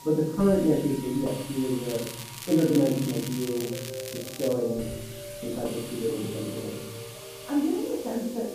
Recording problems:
off-mic speech; far
muffled; very; fading above 1.5 kHz
room echo; noticeable; dies away in 1.3 s
background music; noticeable; throughout; 15 dB below the speech
hiss; noticeable; throughout; 15 dB below the speech
crackling; noticeable; from 2 to 4.5 s; 10 dB below the speech

